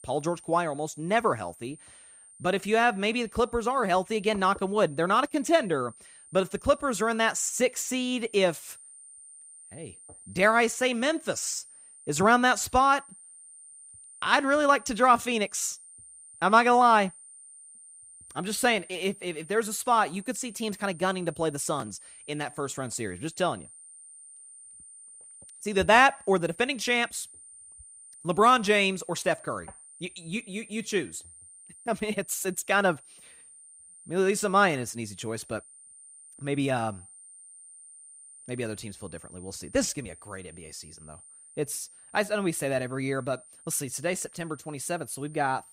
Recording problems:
high-pitched whine; faint; throughout; 9 kHz, 20 dB below the speech

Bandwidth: 15.5 kHz